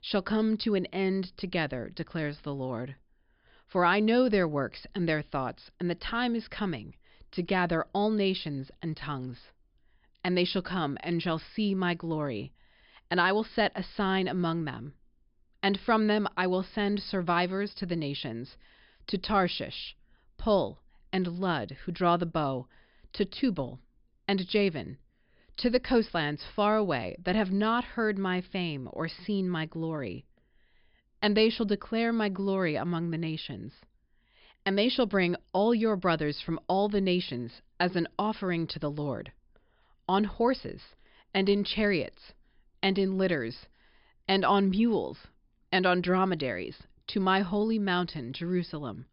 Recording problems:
high frequencies cut off; noticeable; nothing above 5.5 kHz

